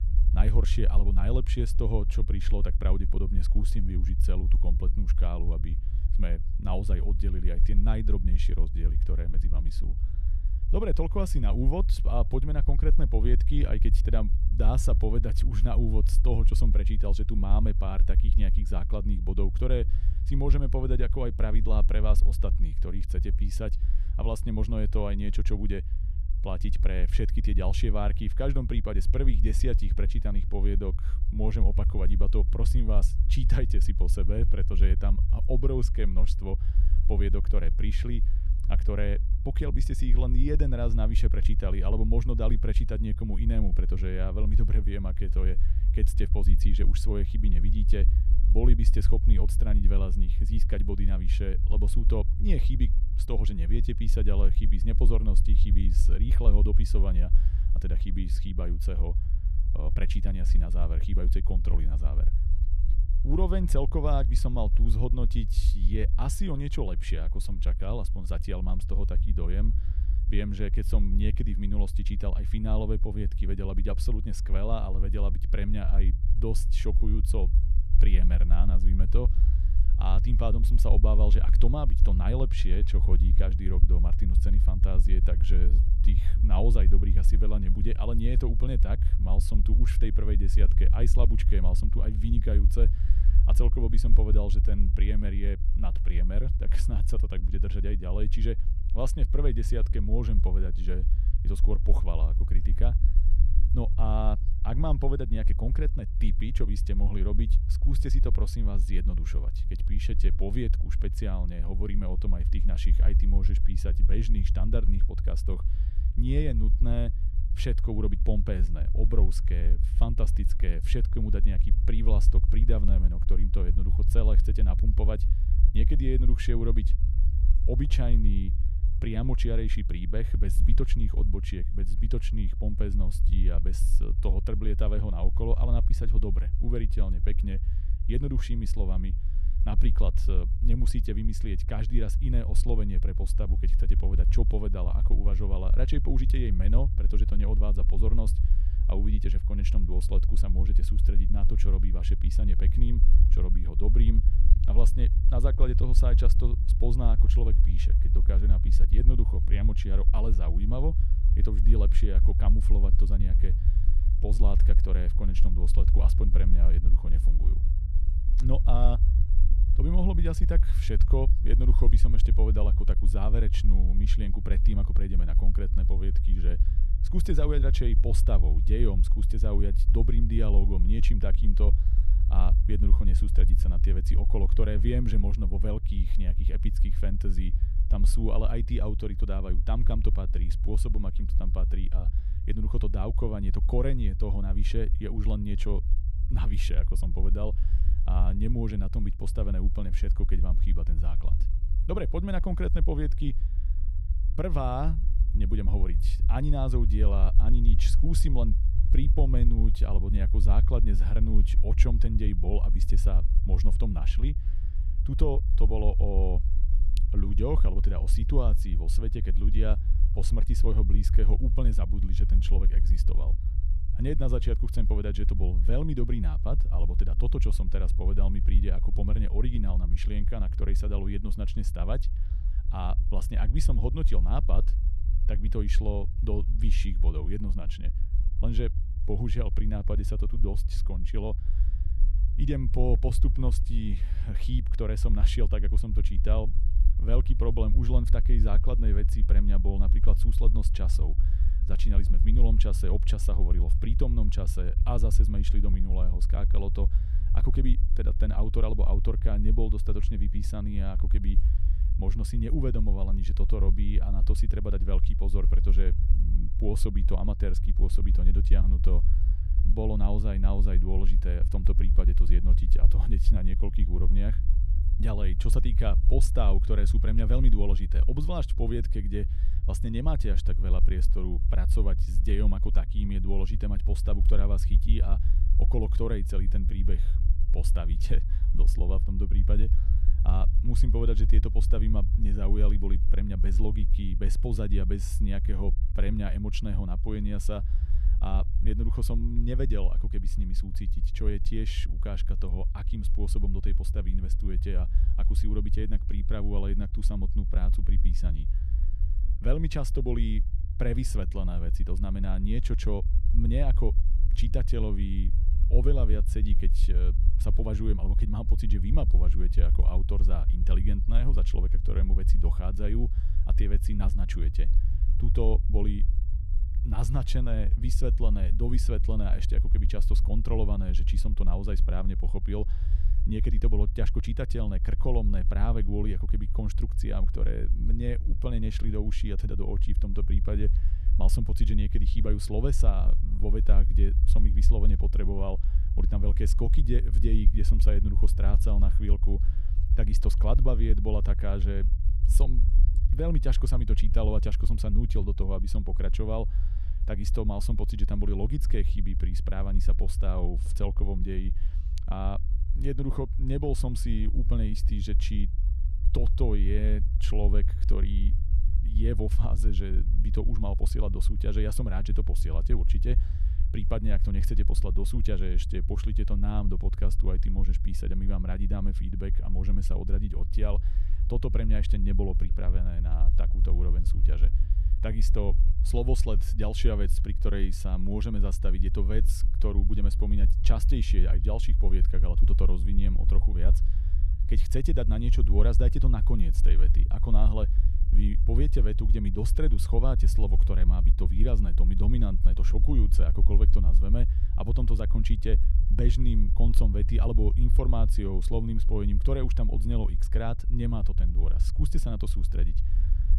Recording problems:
low rumble; loud; throughout; 10 dB below the speech

